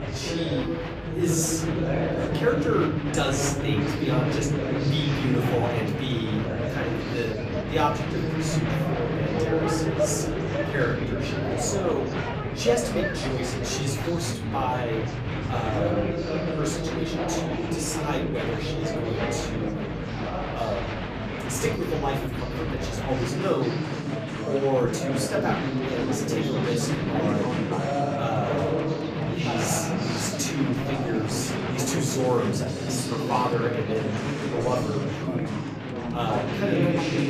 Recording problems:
off-mic speech; far
room echo; slight; dies away in 0.6 s
chatter from many people; very loud; throughout; 2 dB above the speech
background music; noticeable; throughout; 15 dB below the speech

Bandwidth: 14.5 kHz